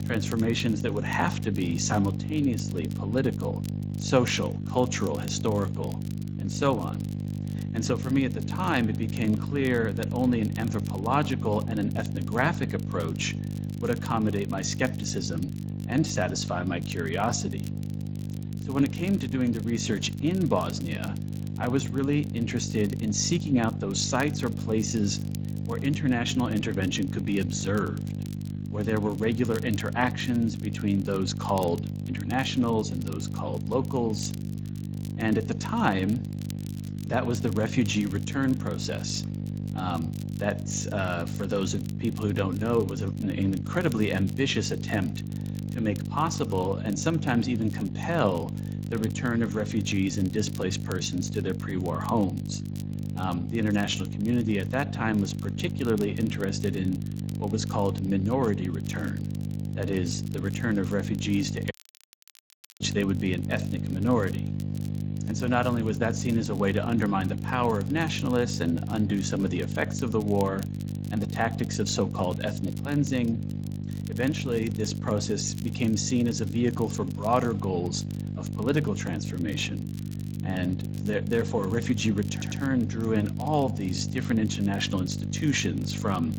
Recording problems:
garbled, watery; slightly; nothing above 7.5 kHz
electrical hum; noticeable; throughout; 50 Hz, 10 dB below the speech
crackle, like an old record; faint; 25 dB below the speech
audio cutting out; at 1:02 for 1 s
audio stuttering; at 1:22

